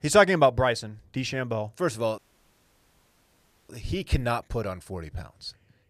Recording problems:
audio cutting out; at 2 s for 1.5 s

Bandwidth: 14.5 kHz